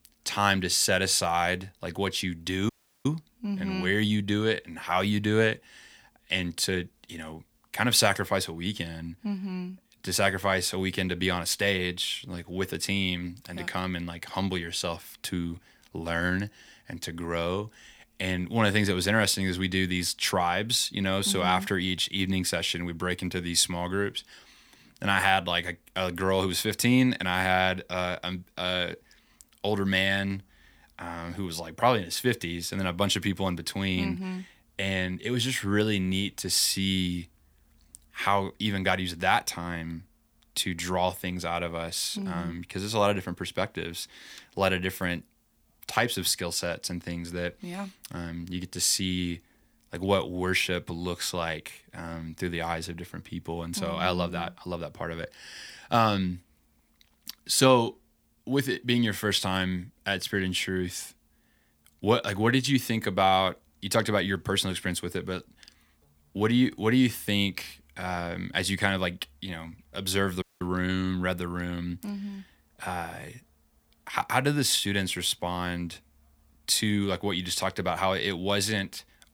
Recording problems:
audio cutting out; at 2.5 s and at 1:10

